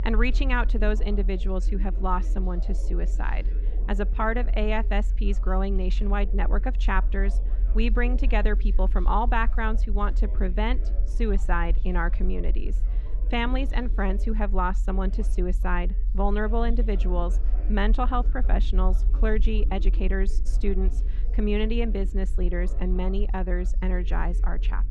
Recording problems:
muffled; slightly; fading above 3.5 kHz
background chatter; noticeable; throughout; 3 voices, 20 dB below the speech
low rumble; faint; throughout; 20 dB below the speech

